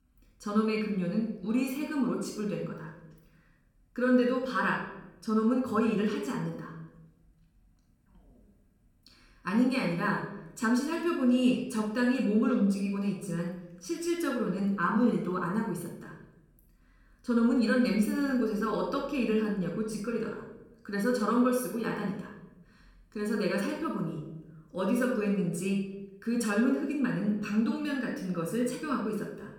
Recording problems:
room echo; noticeable; dies away in 0.7 s
off-mic speech; somewhat distant

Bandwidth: 18 kHz